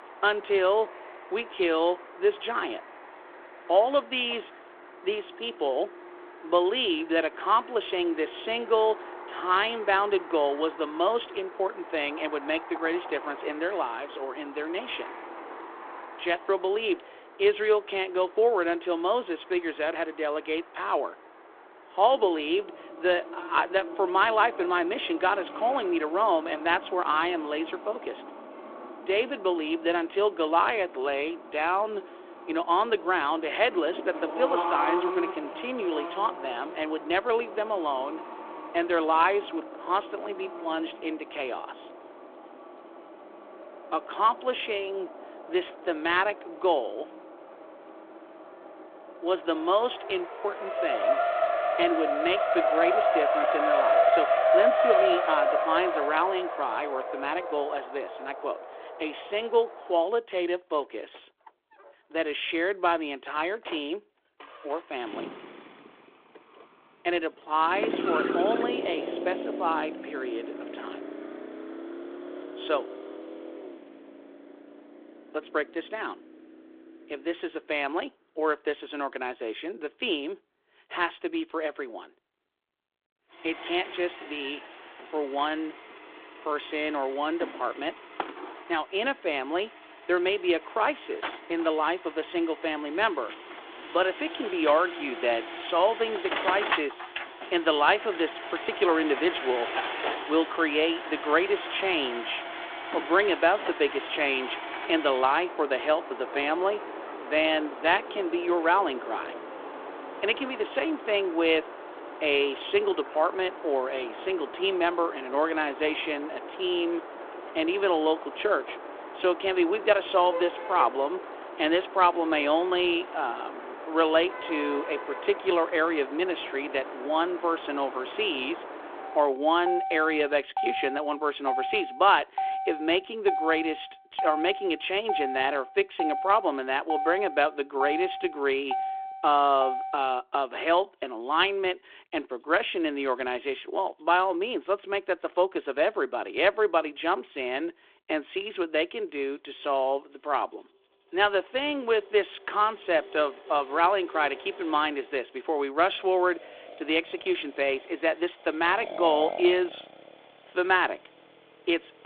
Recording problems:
phone-call audio; nothing above 3.5 kHz
traffic noise; loud; throughout; 6 dB below the speech

